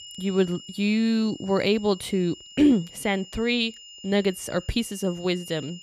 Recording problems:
high-pitched whine; noticeable; throughout; 3 kHz, 20 dB below the speech

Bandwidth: 15 kHz